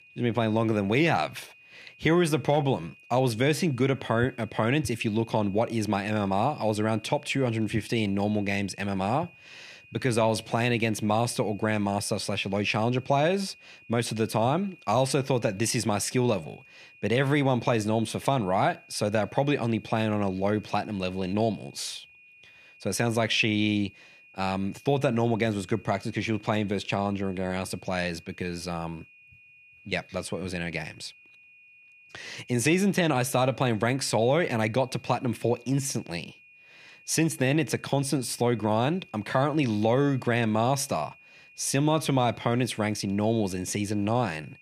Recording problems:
high-pitched whine; faint; throughout; 2.5 kHz, 25 dB below the speech

